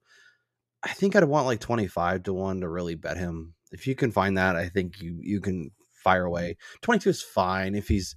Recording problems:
uneven, jittery; strongly; from 1 to 7.5 s

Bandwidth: 14 kHz